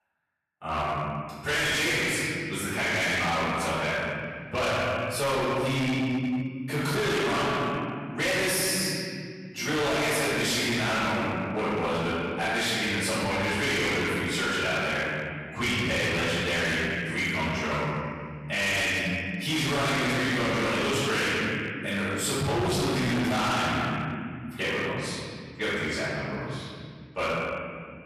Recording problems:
distortion; heavy; 26% of the sound clipped
room echo; strong; dies away in 2.2 s
off-mic speech; far

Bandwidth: 13.5 kHz